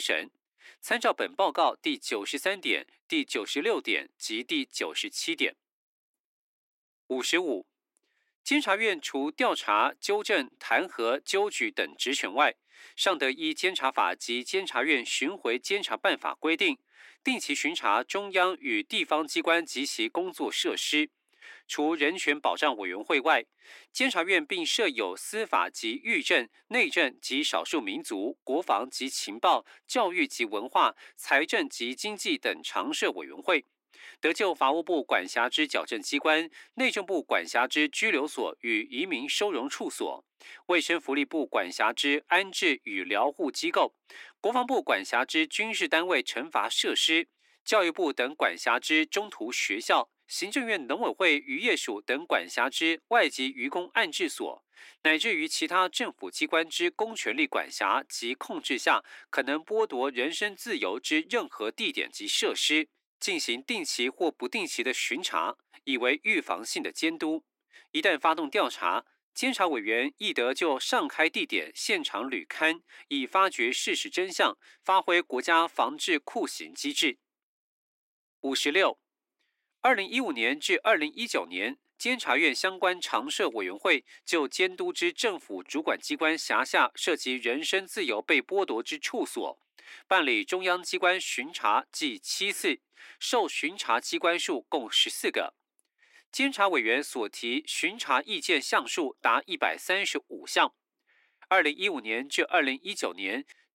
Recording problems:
thin; somewhat; fading below 300 Hz
abrupt cut into speech; at the start

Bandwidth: 16 kHz